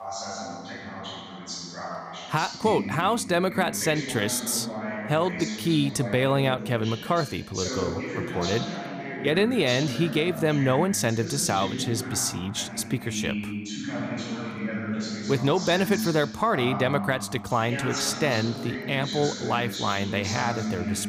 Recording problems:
voice in the background; loud; throughout; 7 dB below the speech

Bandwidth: 15 kHz